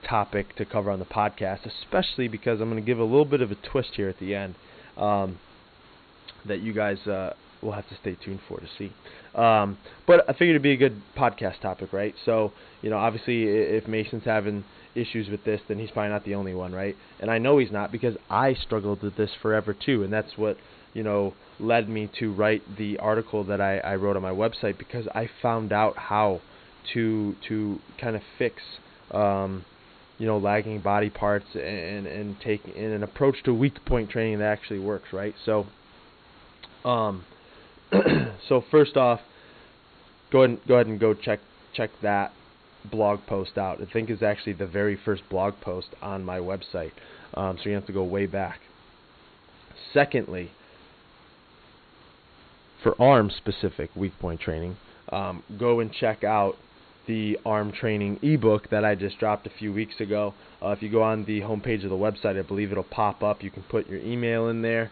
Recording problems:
high frequencies cut off; severe; nothing above 4.5 kHz
hiss; faint; throughout; 25 dB below the speech

